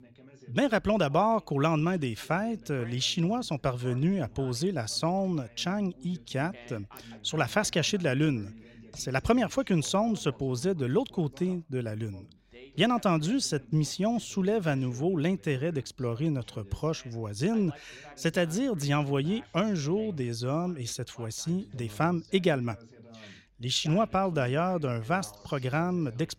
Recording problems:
background chatter; faint; throughout; 2 voices, 20 dB below the speech

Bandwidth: 16 kHz